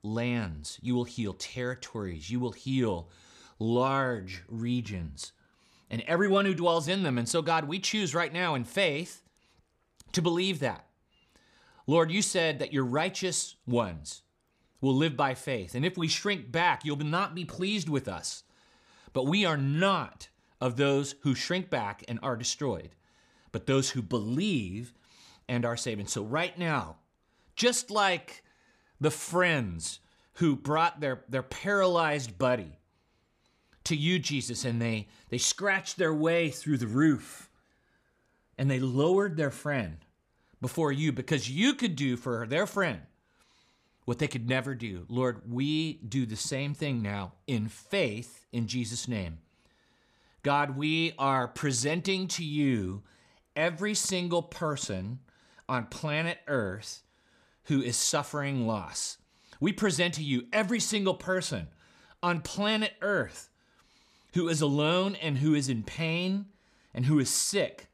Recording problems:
none

